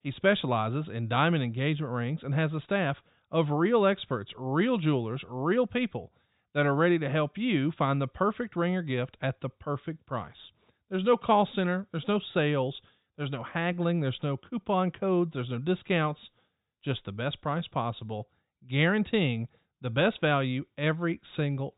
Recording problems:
high frequencies cut off; severe; nothing above 4 kHz

